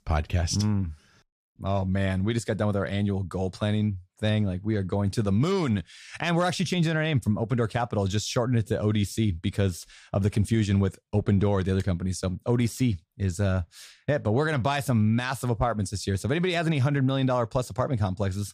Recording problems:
none

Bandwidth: 15 kHz